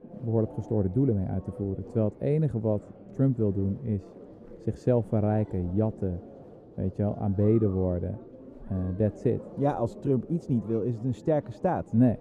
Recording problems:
muffled; very; fading above 1 kHz
murmuring crowd; noticeable; throughout; 20 dB below the speech

